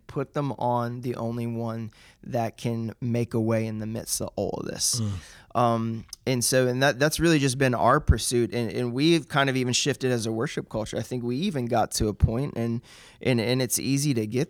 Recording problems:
none

